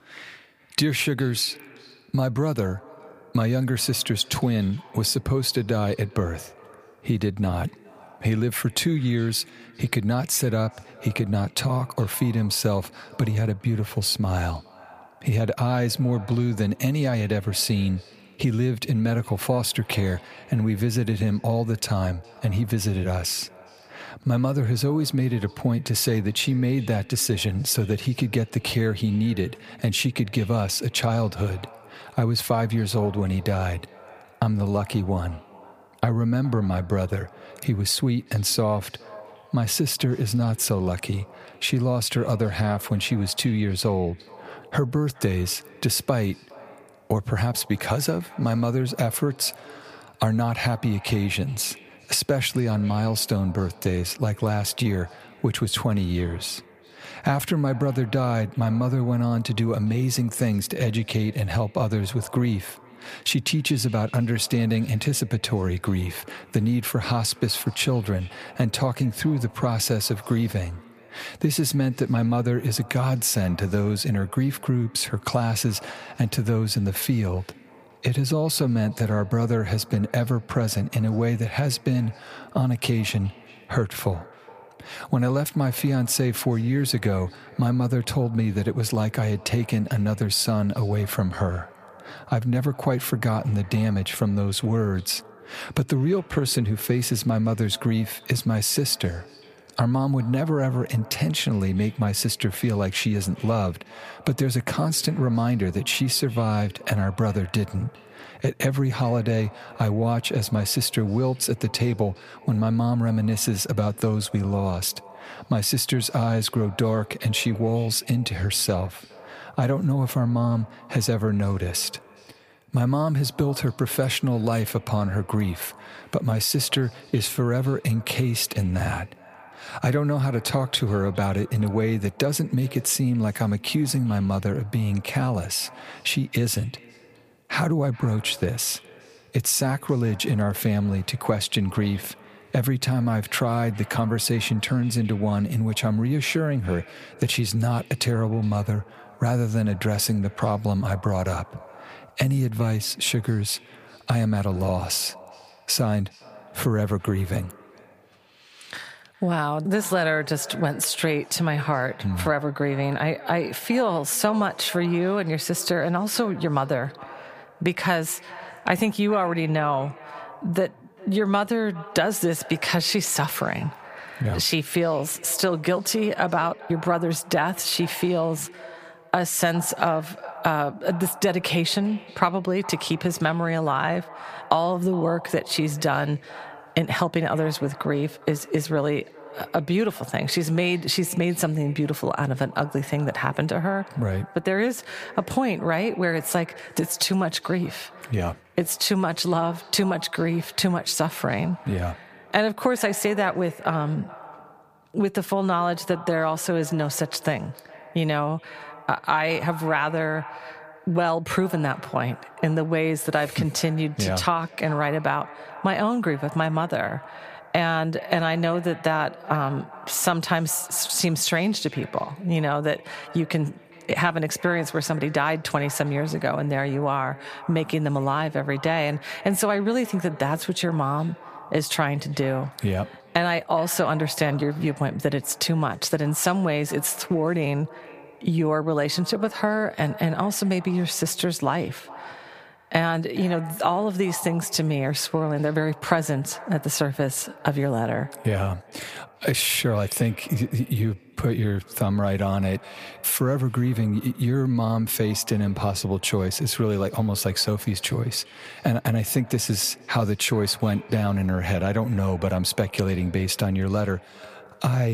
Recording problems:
echo of what is said; faint; throughout; 410 ms later, 20 dB below the speech
squashed, flat; somewhat
abrupt cut into speech; at the end

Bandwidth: 15 kHz